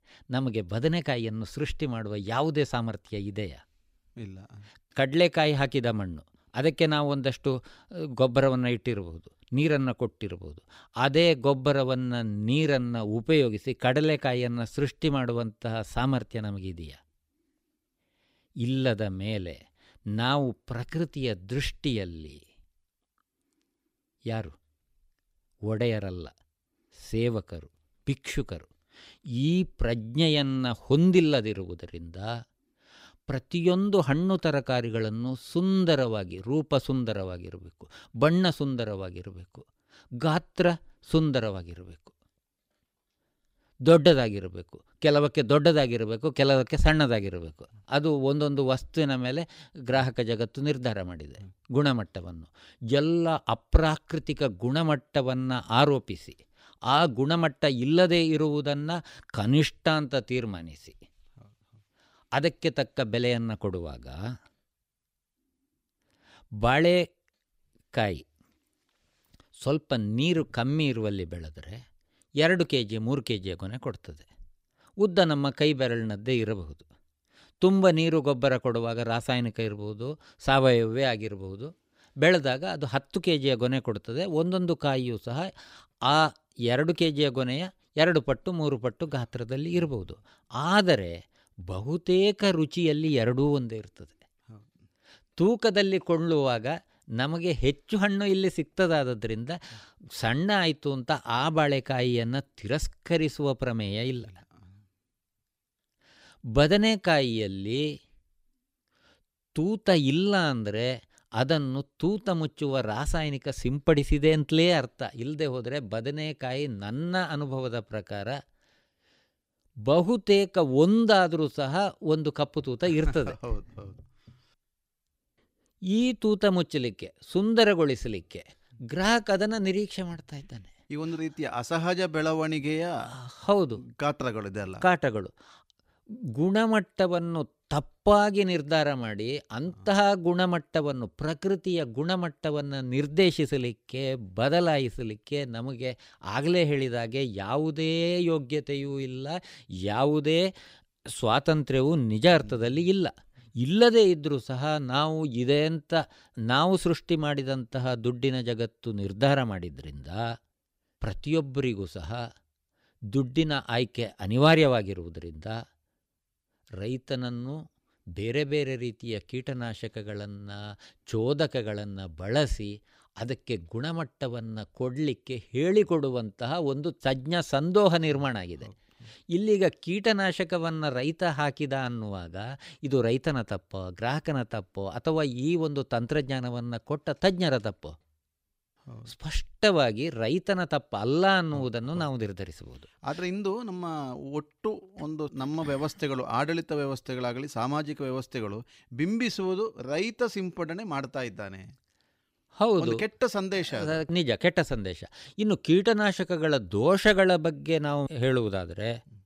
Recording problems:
none

